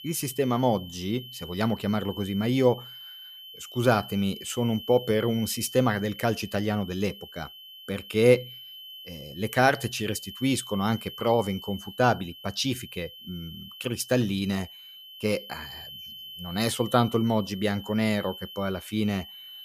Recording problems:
high-pitched whine; noticeable; throughout; 3 kHz, 15 dB below the speech

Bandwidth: 15 kHz